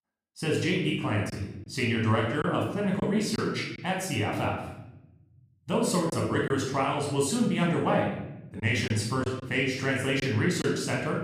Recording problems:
off-mic speech; far
room echo; noticeable; dies away in 1 s
choppy; occasionally; 3% of the speech affected

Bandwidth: 14.5 kHz